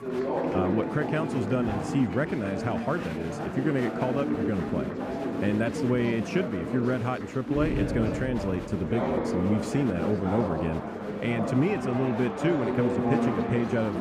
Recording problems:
muffled; slightly; fading above 3.5 kHz
chatter from many people; loud; throughout; 2 dB below the speech

